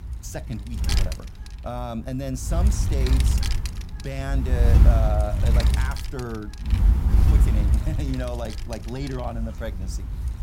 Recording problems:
wind noise on the microphone; heavy; 2 dB below the speech

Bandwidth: 16 kHz